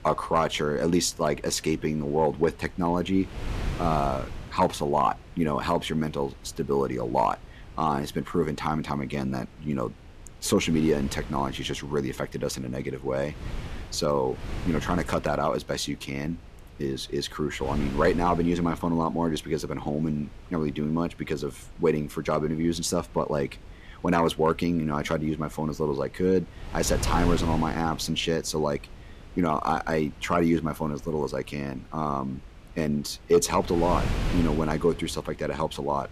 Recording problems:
wind noise on the microphone; occasional gusts; 15 dB below the speech

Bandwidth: 14.5 kHz